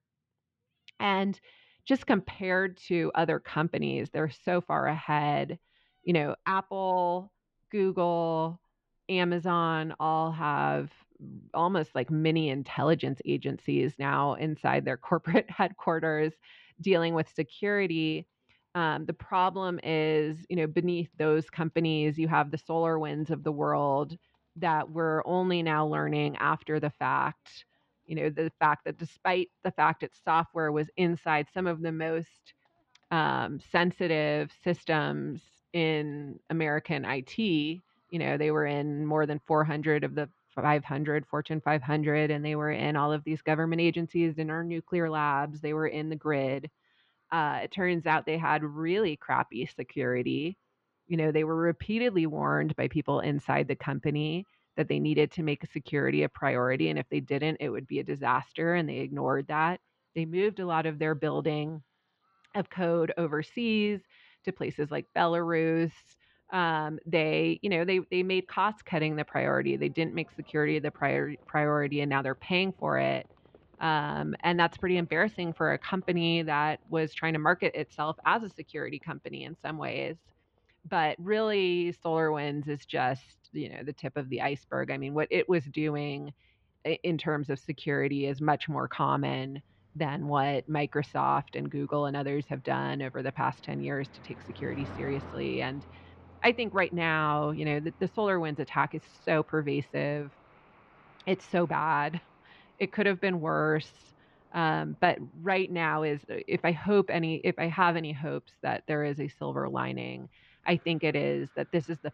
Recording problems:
muffled; slightly; fading above 3.5 kHz
animal sounds; faint; throughout; 25 dB below the speech

